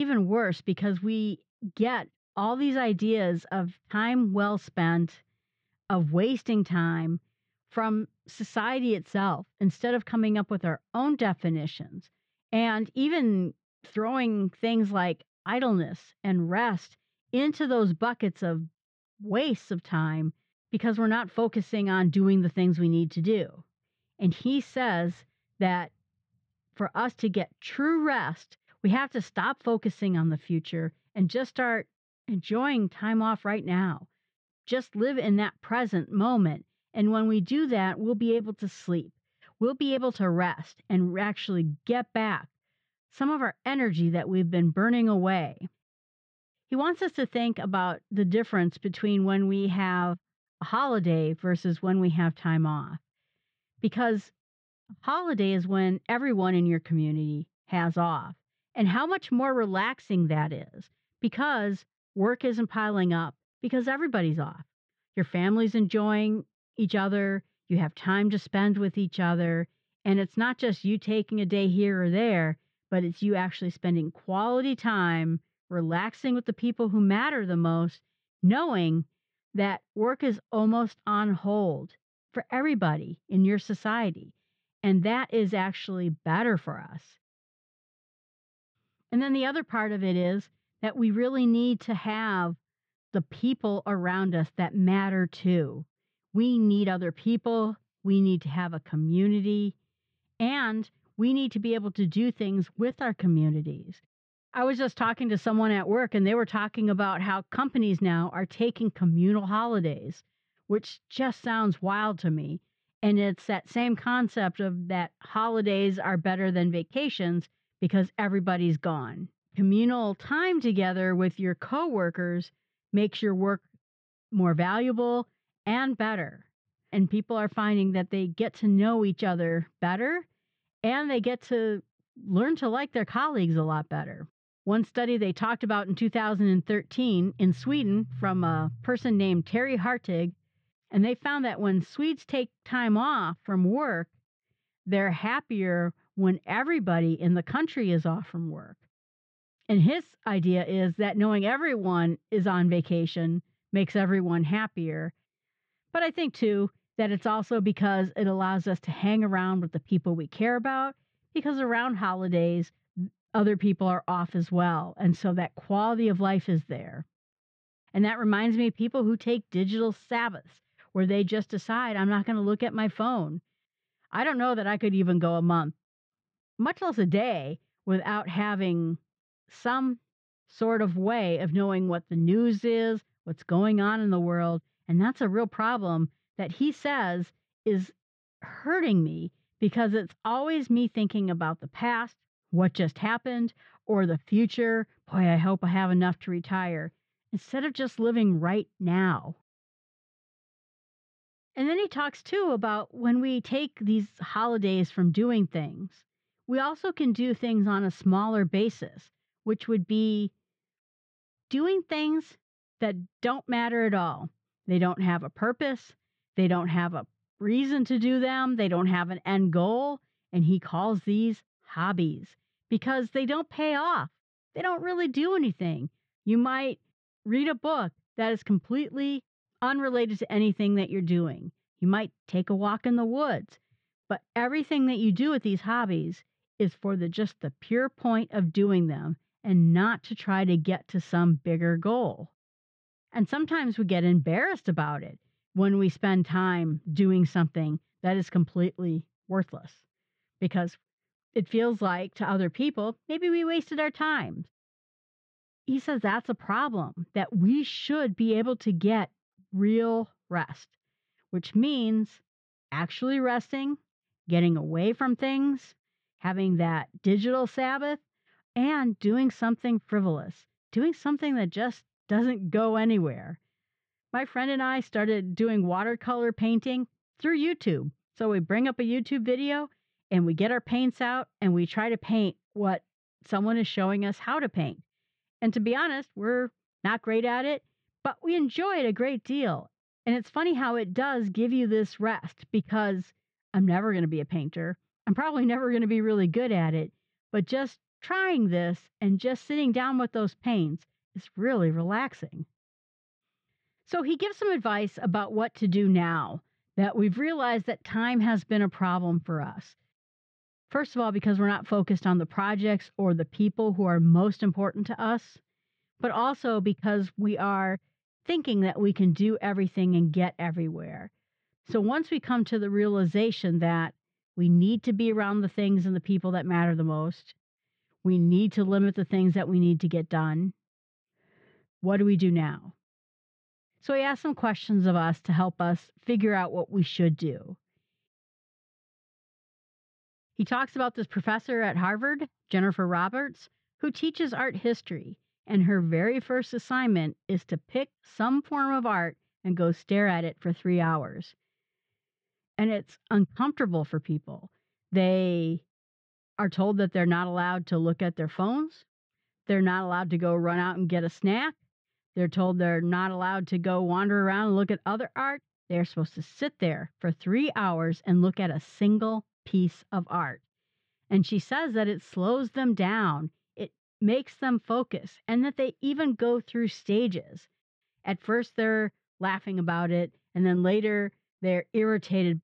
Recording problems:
muffled; very; fading above 2.5 kHz
abrupt cut into speech; at the start

